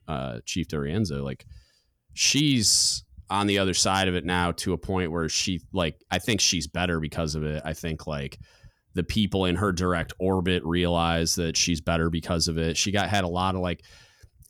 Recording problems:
none

